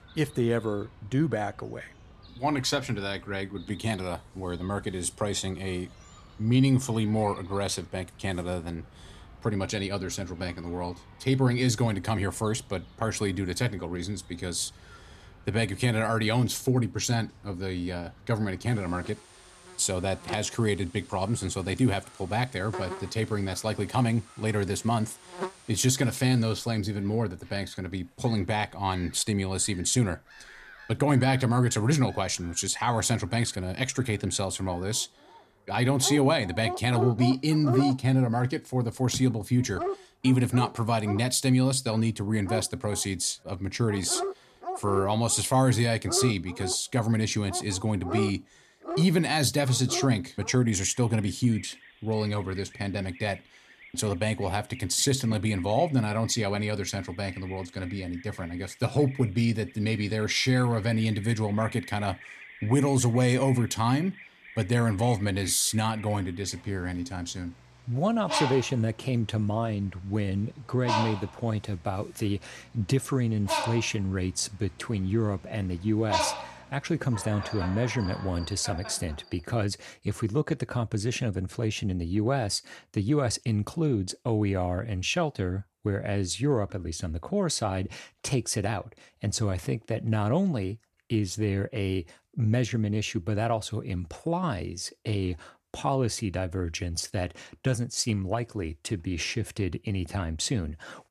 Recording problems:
animal sounds; noticeable; until 1:19; 10 dB below the speech

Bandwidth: 14.5 kHz